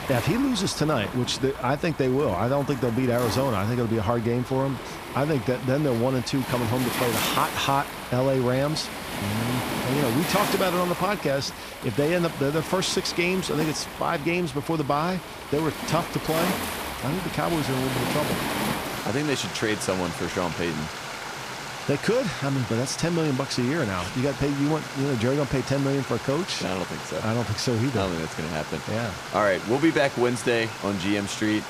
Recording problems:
rain or running water; loud; throughout; 6 dB below the speech
high-pitched whine; faint; throughout; 2 kHz, 30 dB below the speech

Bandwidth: 15 kHz